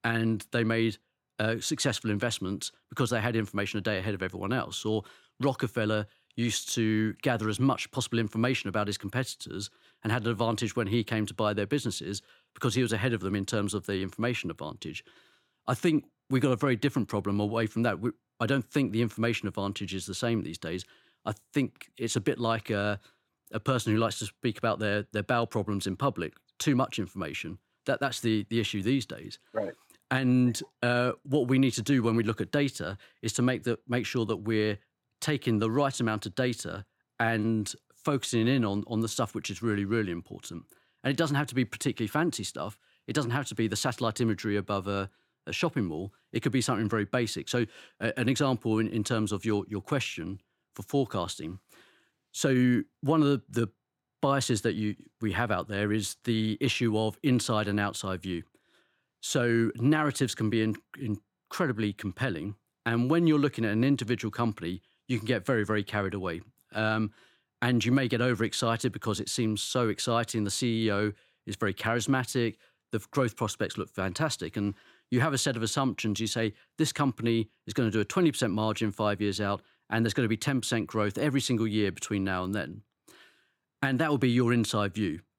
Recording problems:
none

